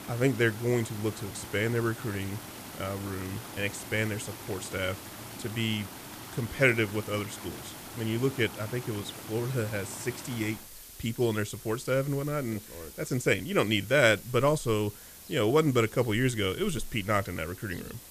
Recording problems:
rain or running water; noticeable; throughout; 15 dB below the speech
hiss; noticeable; throughout; 15 dB below the speech

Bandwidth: 14.5 kHz